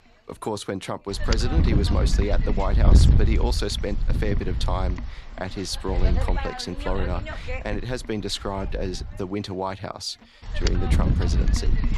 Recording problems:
wind noise on the microphone; heavy; 5 dB below the speech

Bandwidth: 14.5 kHz